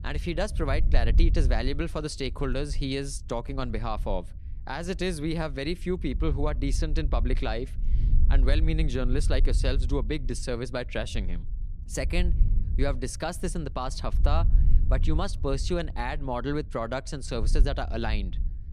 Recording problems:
wind noise on the microphone; occasional gusts; 15 dB below the speech

